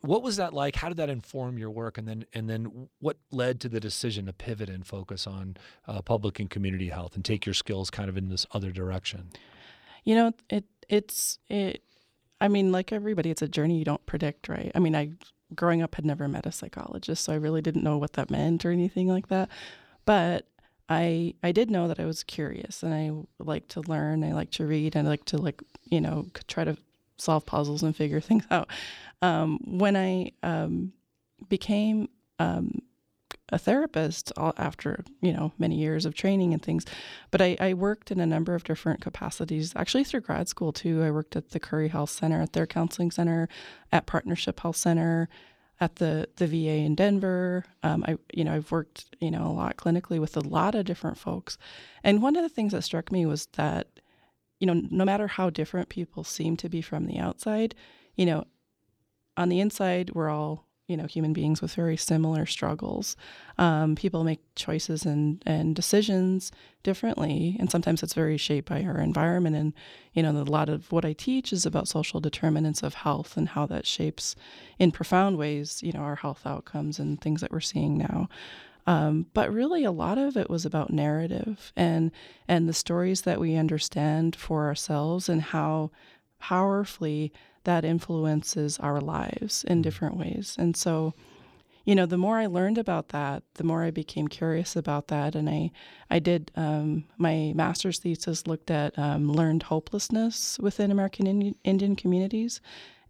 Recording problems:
uneven, jittery; strongly; from 3 s to 1:39

